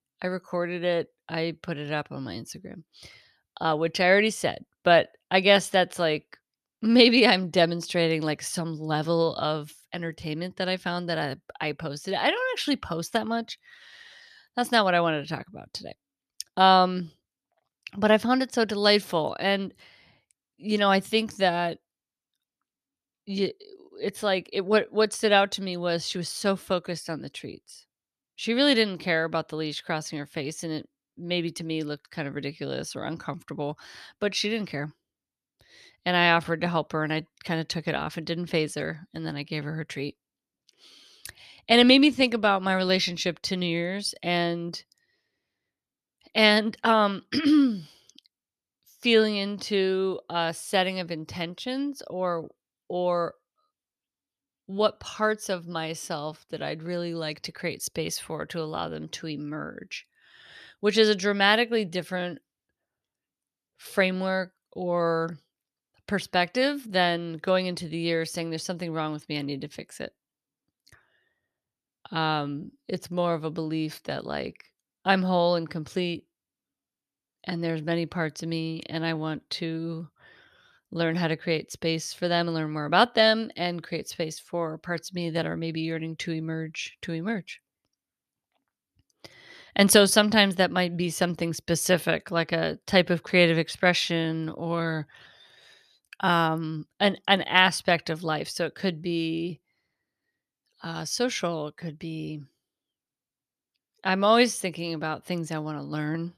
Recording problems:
none

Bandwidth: 13.5 kHz